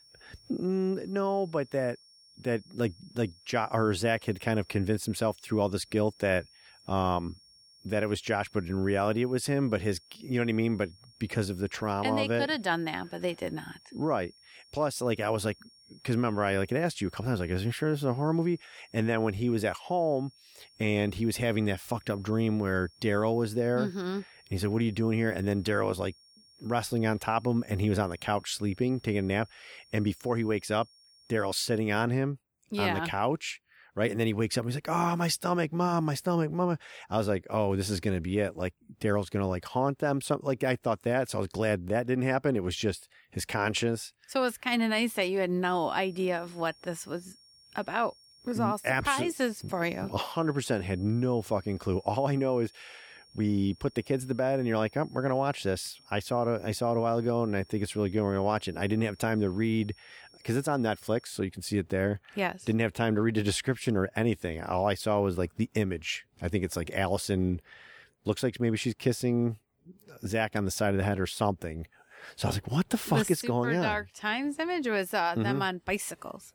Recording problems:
high-pitched whine; faint; until 32 s and from 46 s to 1:01; 5.5 kHz, 25 dB below the speech

